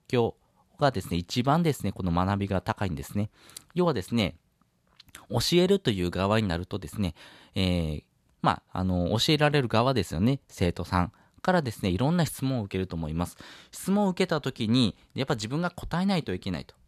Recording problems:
none

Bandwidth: 14 kHz